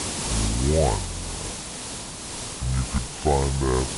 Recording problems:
wrong speed and pitch; too slow and too low; 0.6 times normal speed
high frequencies cut off; noticeable; nothing above 7.5 kHz
hiss; loud; throughout; 5 dB below the speech

